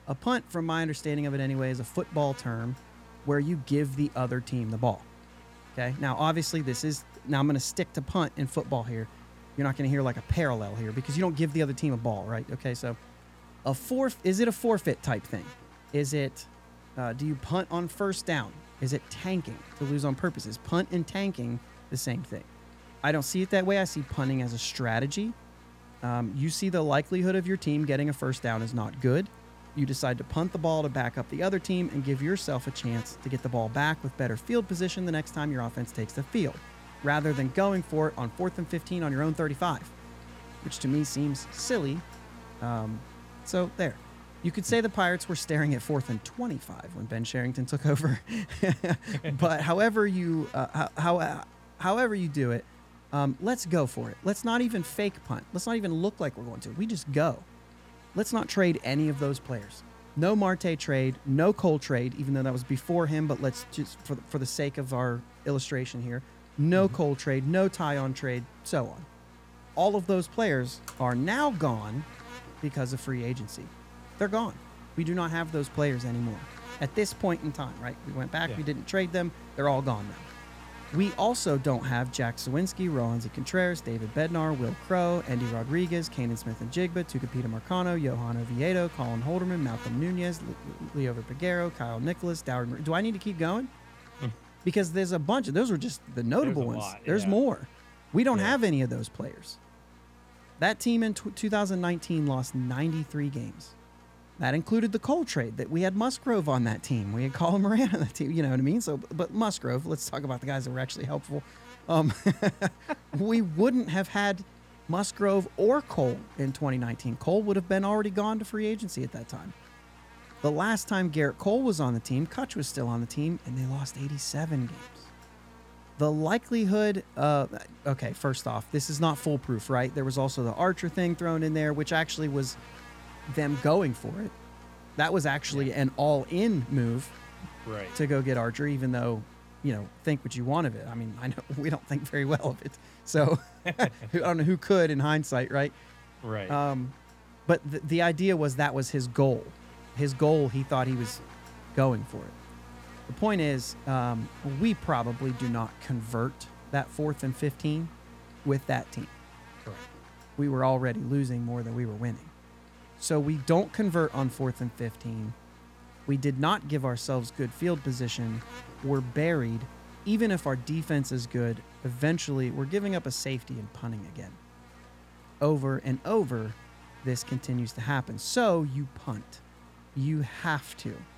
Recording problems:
electrical hum; noticeable; throughout; 60 Hz, 20 dB below the speech

